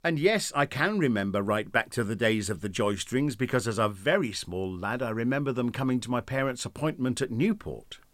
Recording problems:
none

